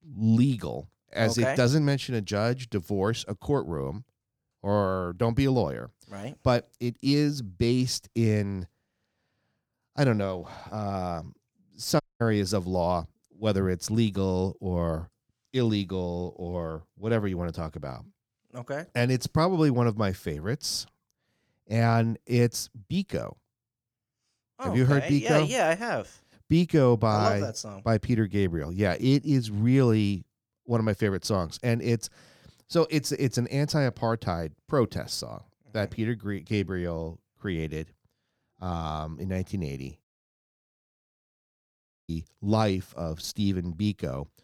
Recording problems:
audio cutting out; at 12 s and at 40 s for 2 s

